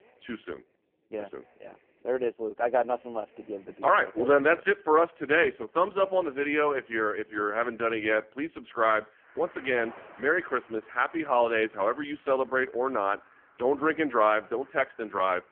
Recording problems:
phone-call audio; poor line; nothing above 3.5 kHz
traffic noise; faint; throughout; 30 dB below the speech

